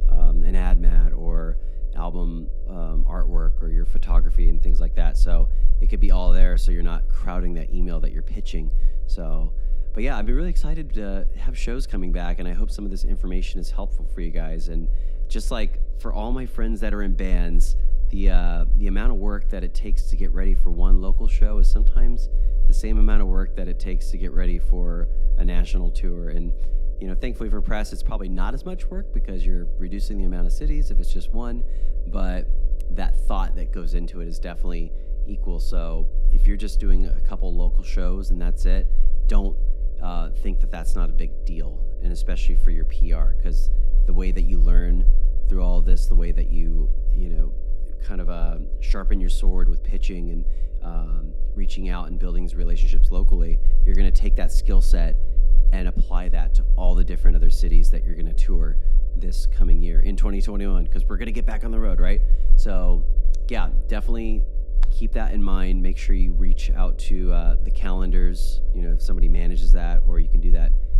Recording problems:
electrical hum; noticeable; throughout; 50 Hz, 15 dB below the speech
low rumble; noticeable; throughout; 20 dB below the speech

